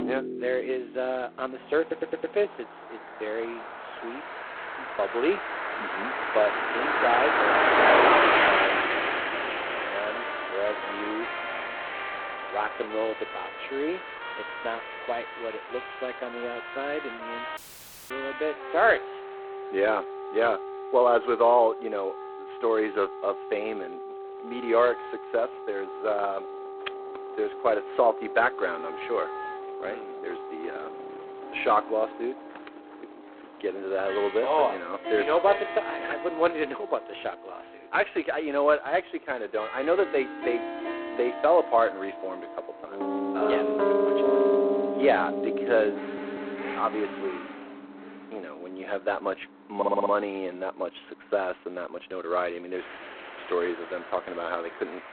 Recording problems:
phone-call audio; poor line; nothing above 4 kHz
traffic noise; very loud; throughout; 1 dB above the speech
background music; loud; throughout; 6 dB below the speech
audio stuttering; at 2 s, at 46 s and at 50 s
audio cutting out; at 18 s for 0.5 s

